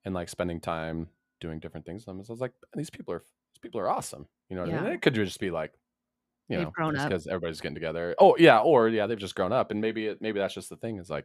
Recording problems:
none

